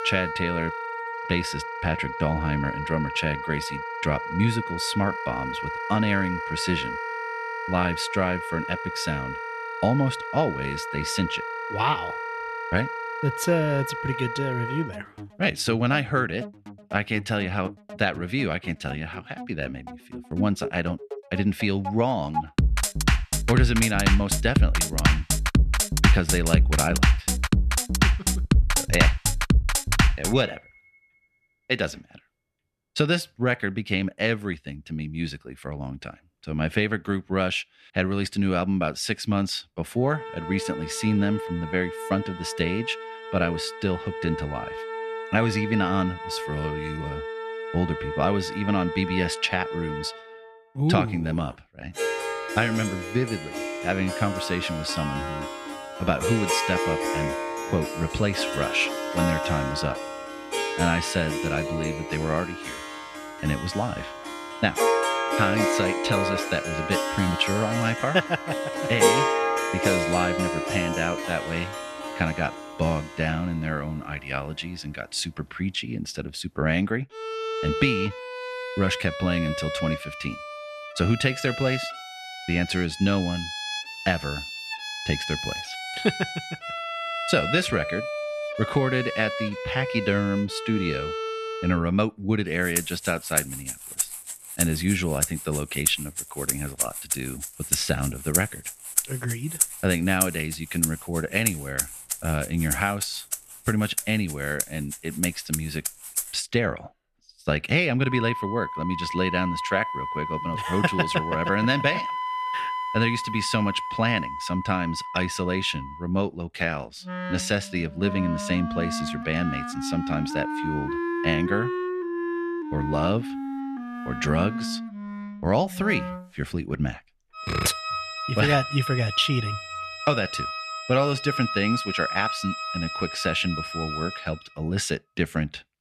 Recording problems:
background music; loud; throughout; 2 dB below the speech

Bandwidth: 13.5 kHz